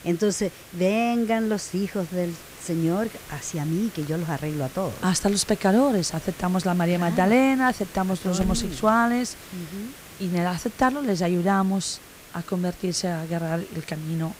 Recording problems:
hiss; noticeable; throughout; 15 dB below the speech

